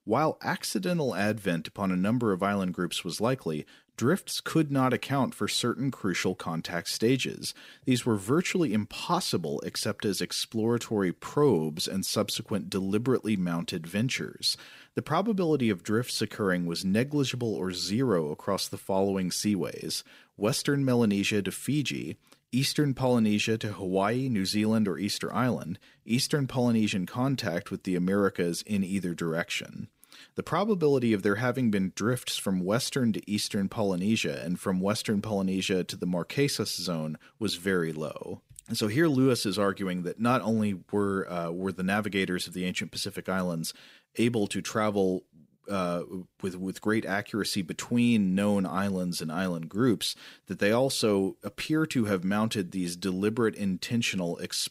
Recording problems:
none

